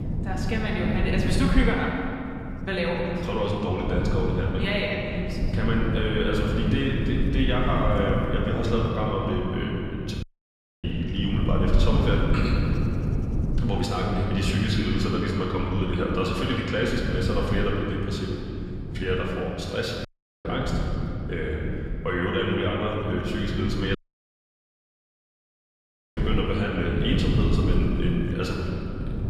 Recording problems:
off-mic speech; far
room echo; noticeable; dies away in 2.5 s
wind noise on the microphone; occasional gusts; 10 dB below the speech
audio cutting out; at 10 s for 0.5 s, at 20 s and at 24 s for 2 s

